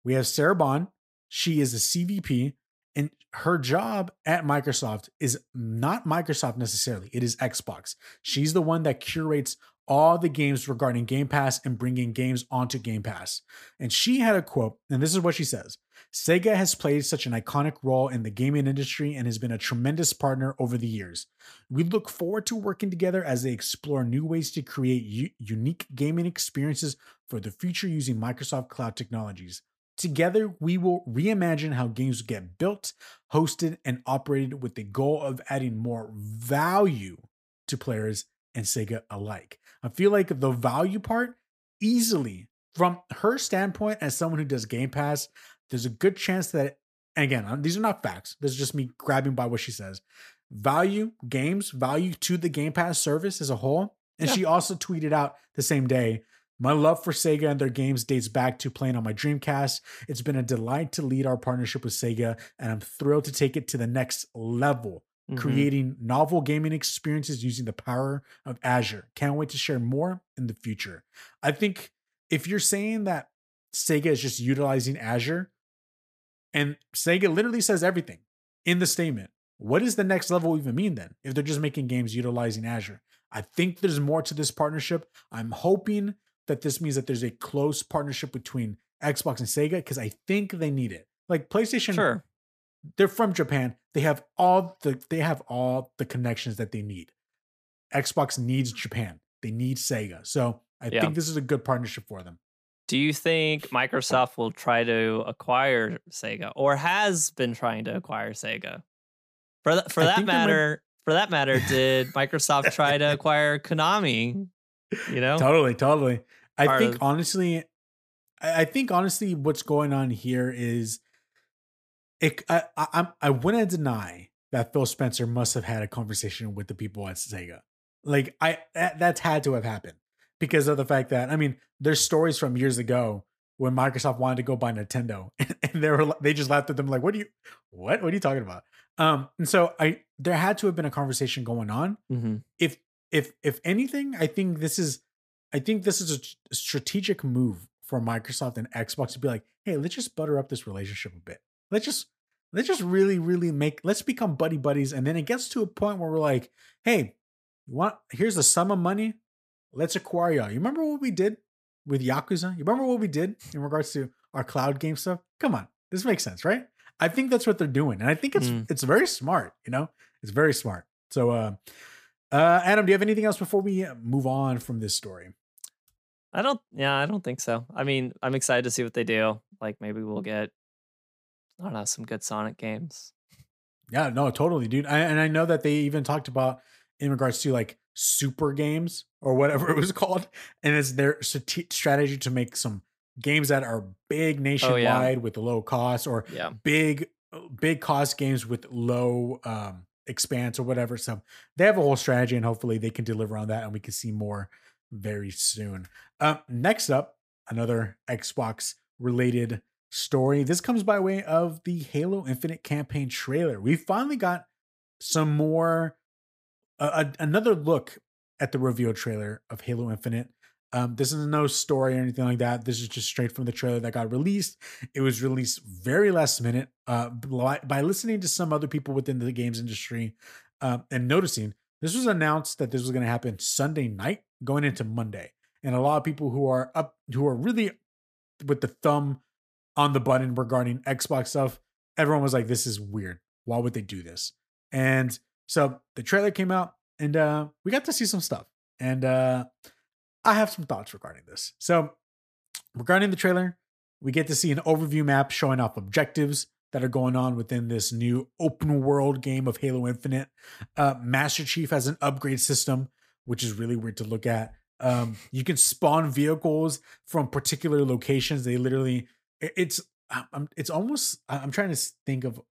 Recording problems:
none

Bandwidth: 15 kHz